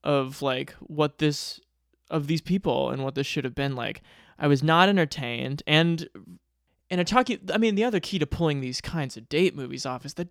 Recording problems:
none

